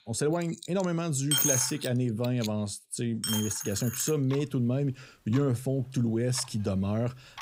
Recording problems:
household noises; loud; throughout; 1 dB below the speech

